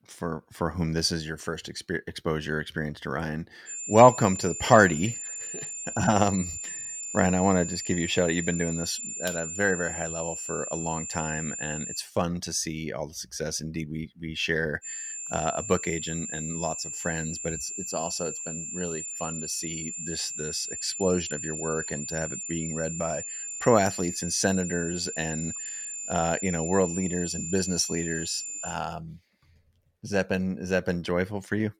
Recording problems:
high-pitched whine; loud; from 3.5 to 12 s and from 15 to 29 s; 7 kHz, 5 dB below the speech

